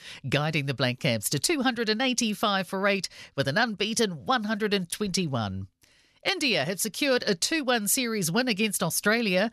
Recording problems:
none

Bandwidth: 14 kHz